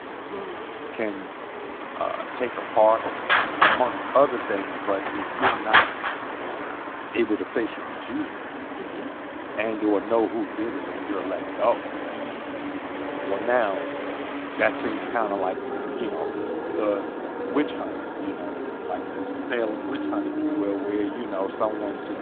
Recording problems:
phone-call audio
traffic noise; loud; throughout; 1 dB below the speech

